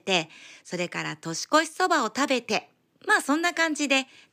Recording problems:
none

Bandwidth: 15 kHz